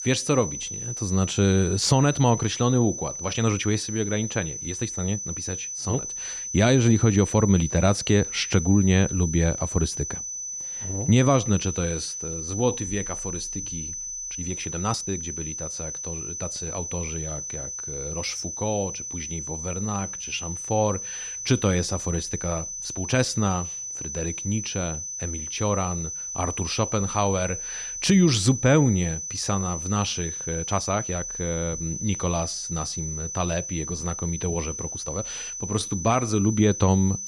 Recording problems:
high-pitched whine; loud; throughout; 6 kHz, 6 dB below the speech
uneven, jittery; strongly; from 3 to 36 s

